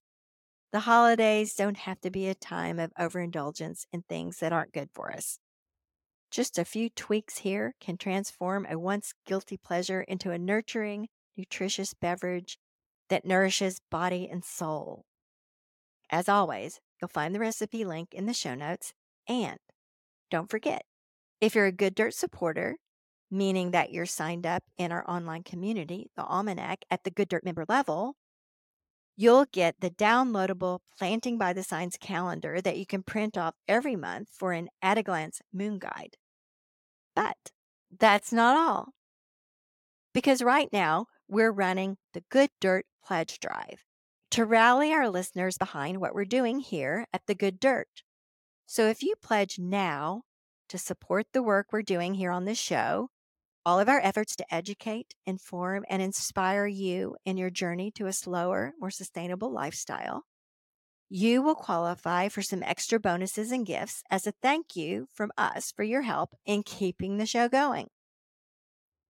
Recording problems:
uneven, jittery; strongly; from 1 s to 1:07

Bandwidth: 17 kHz